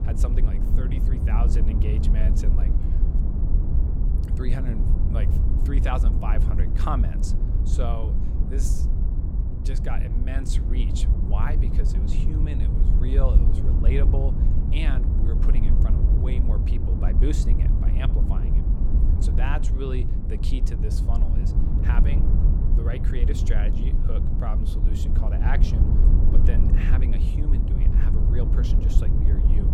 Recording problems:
wind noise on the microphone; heavy; 2 dB below the speech

